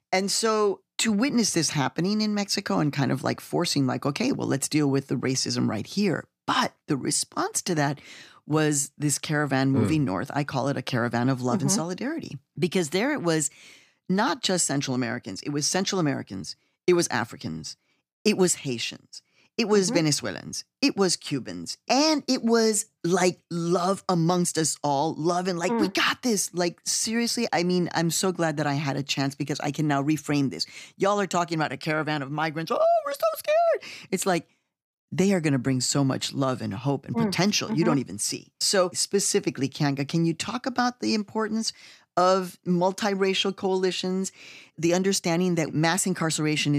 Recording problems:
abrupt cut into speech; at the end

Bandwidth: 15 kHz